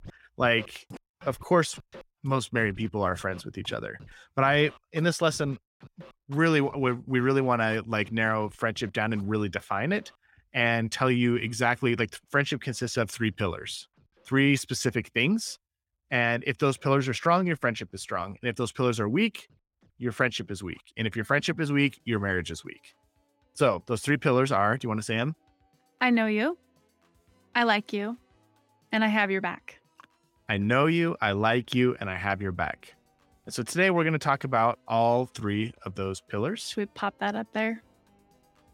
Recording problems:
background music; faint; throughout; 30 dB below the speech

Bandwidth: 16.5 kHz